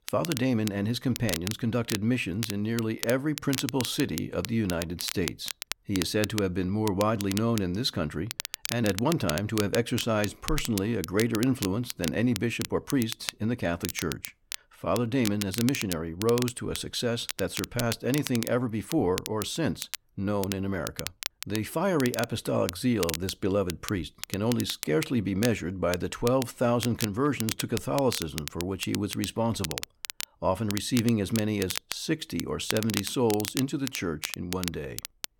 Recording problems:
crackle, like an old record; loud; 8 dB below the speech

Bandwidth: 17 kHz